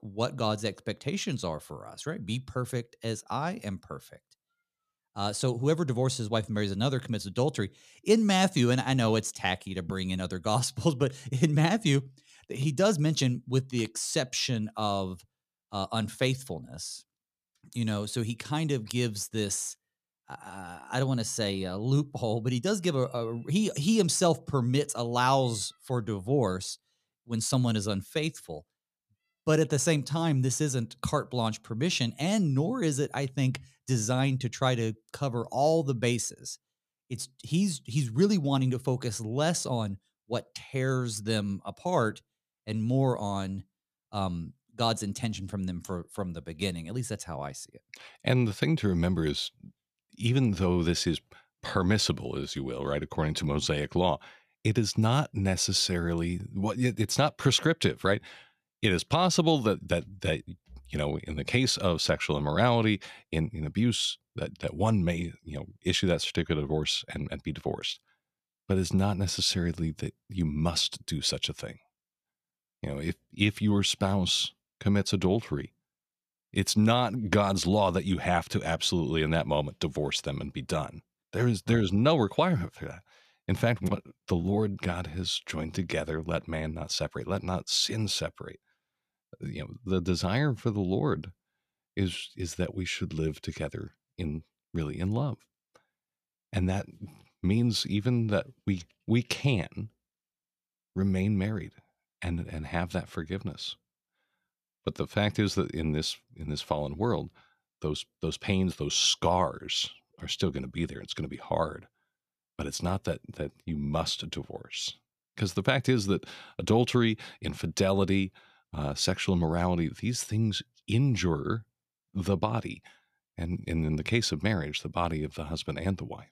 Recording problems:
none

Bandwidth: 14.5 kHz